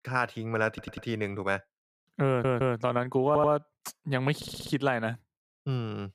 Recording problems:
audio stuttering; 4 times, first at 0.5 s

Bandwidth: 15 kHz